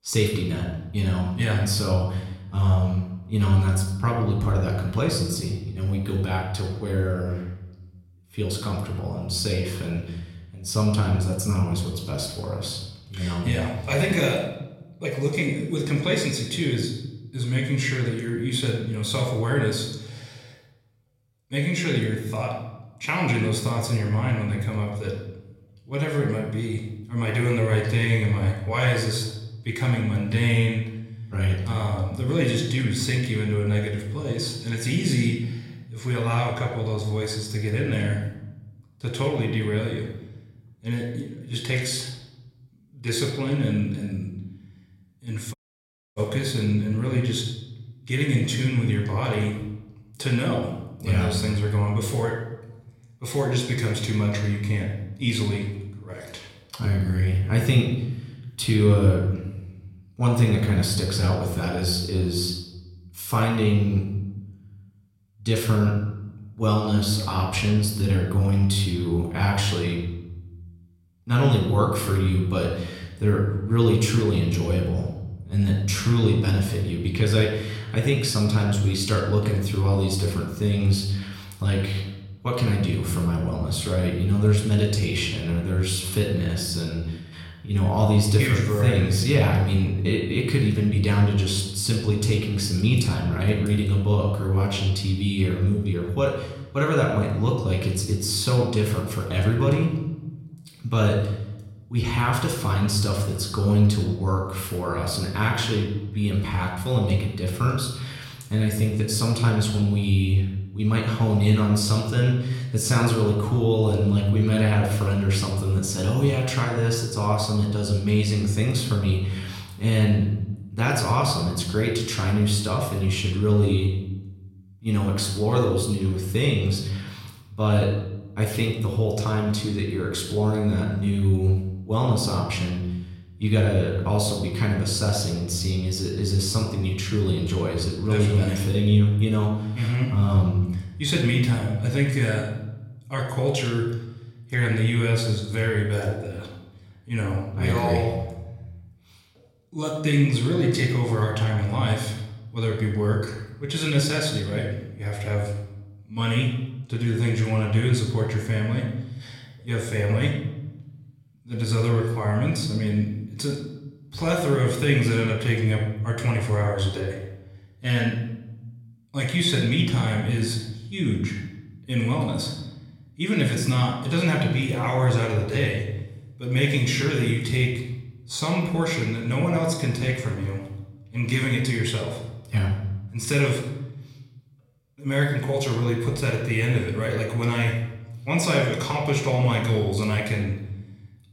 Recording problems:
room echo; noticeable; dies away in 0.9 s
off-mic speech; somewhat distant
audio cutting out; at 46 s for 0.5 s

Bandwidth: 16 kHz